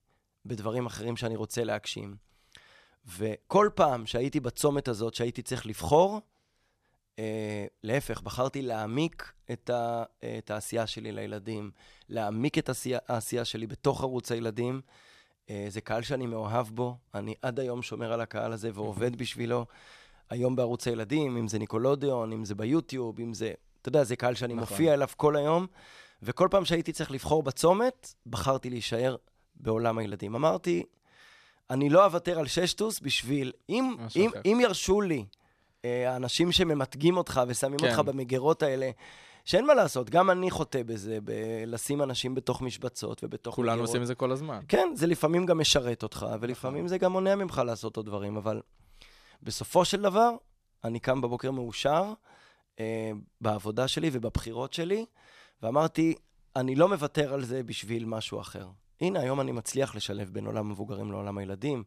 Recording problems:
none

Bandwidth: 14 kHz